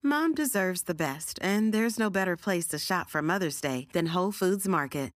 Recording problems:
none

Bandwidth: 15 kHz